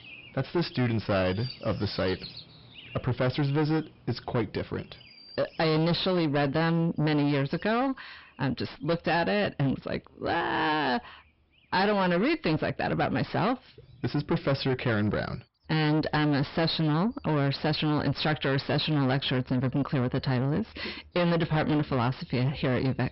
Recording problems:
distortion; heavy; 7 dB below the speech
high frequencies cut off; noticeable; nothing above 5.5 kHz
animal sounds; faint; throughout; 20 dB below the speech

